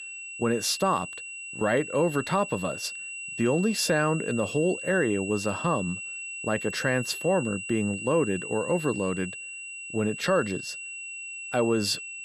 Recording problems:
high-pitched whine; loud; throughout; 2.5 kHz, 8 dB below the speech

